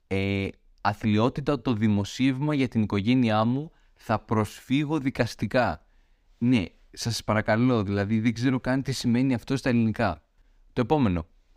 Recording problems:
none

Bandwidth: 15.5 kHz